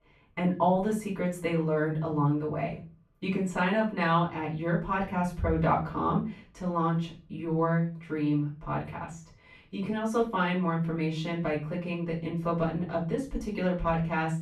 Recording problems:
off-mic speech; far
muffled; slightly; fading above 3 kHz
room echo; slight; dies away in 0.3 s

